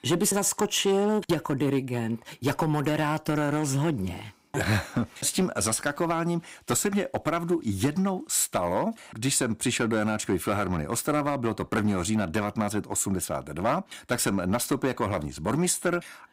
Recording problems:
distortion; slight; 4% of the sound clipped

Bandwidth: 15.5 kHz